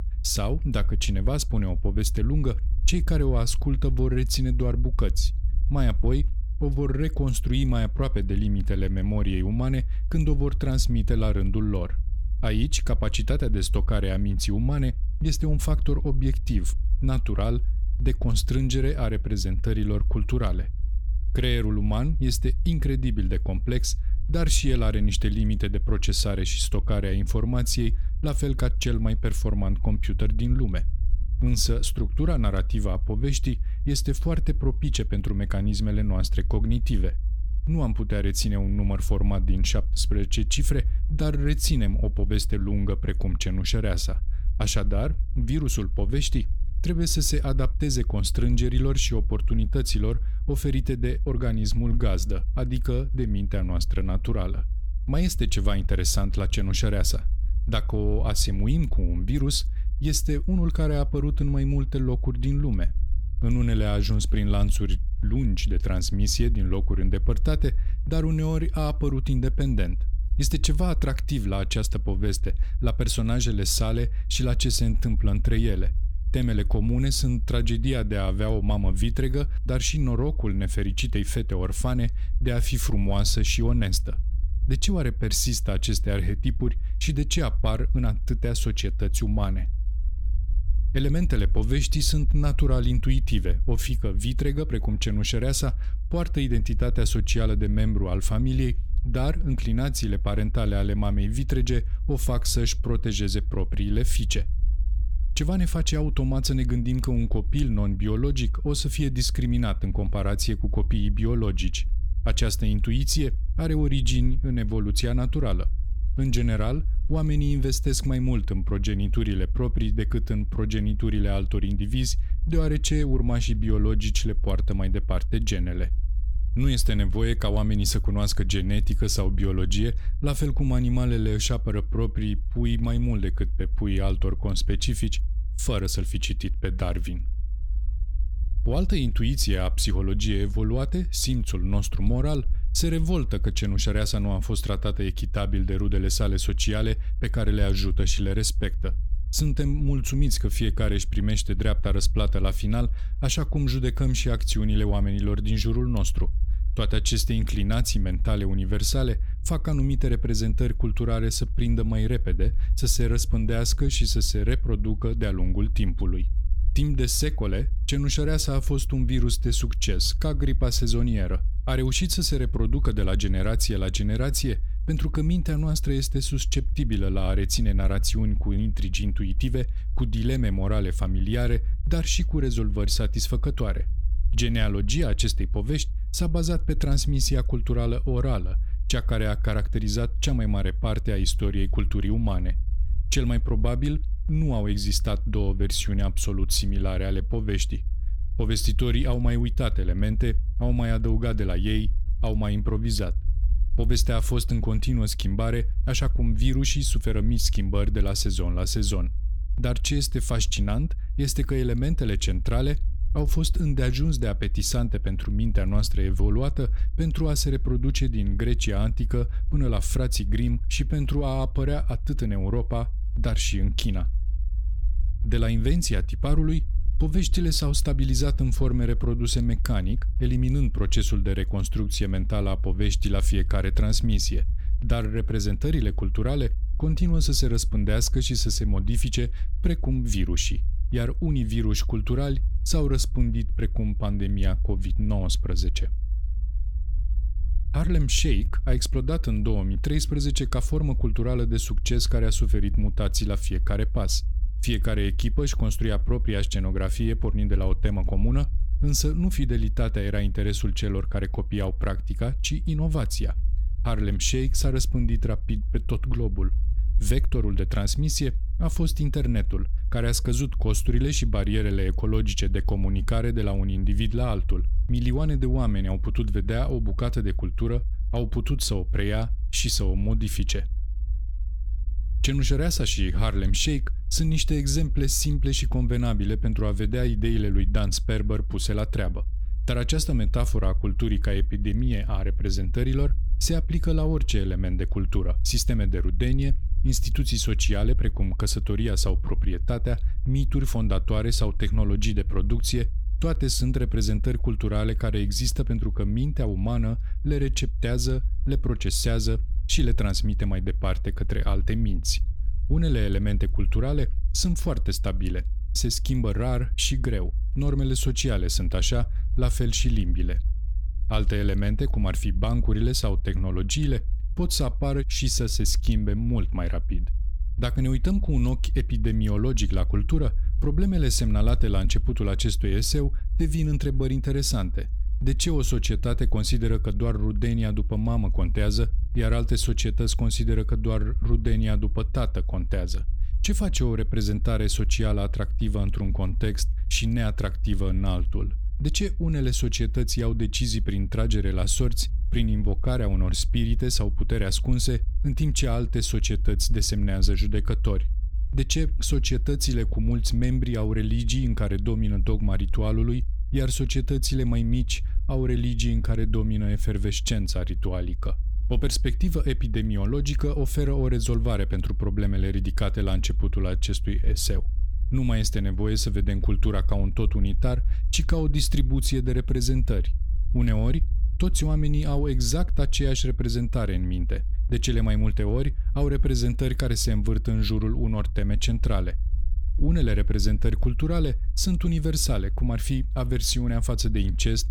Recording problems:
low rumble; noticeable; throughout; 20 dB below the speech

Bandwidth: 18.5 kHz